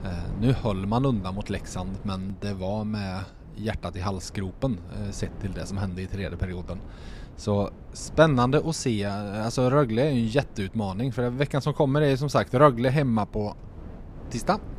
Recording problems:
wind noise on the microphone; occasional gusts; 25 dB below the speech

